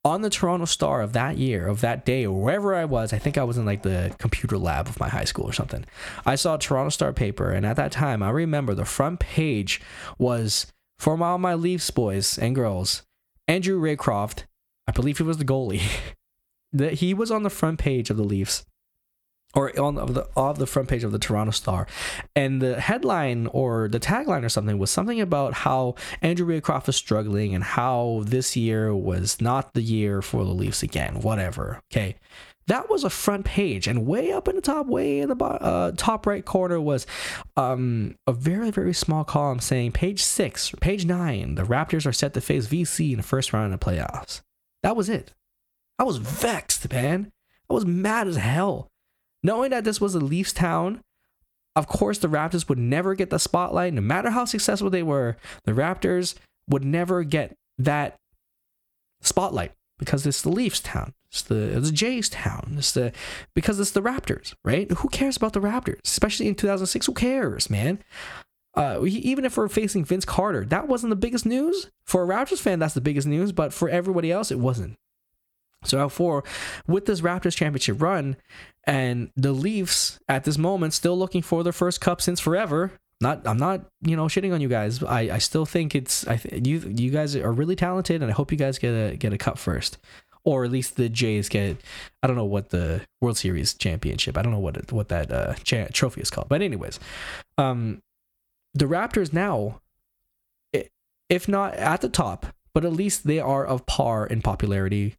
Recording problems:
squashed, flat; somewhat

